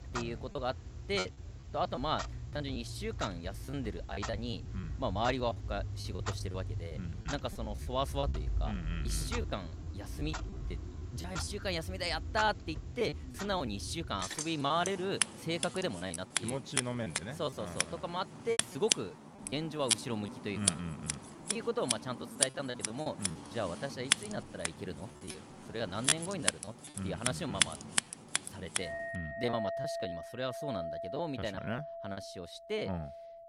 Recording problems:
household noises; very loud; throughout; as loud as the speech
choppy; very; 9% of the speech affected

